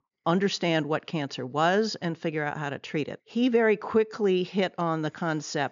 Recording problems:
high frequencies cut off; noticeable; nothing above 7 kHz

